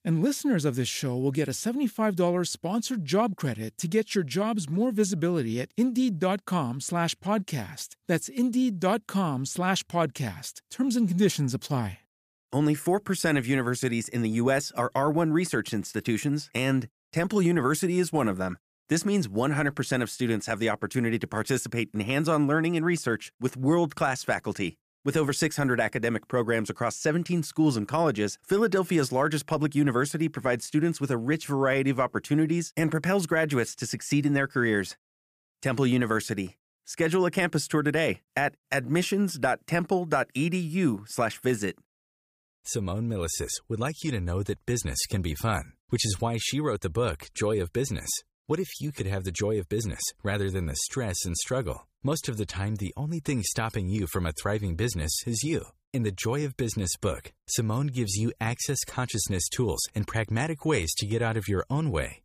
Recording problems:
none

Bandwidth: 15 kHz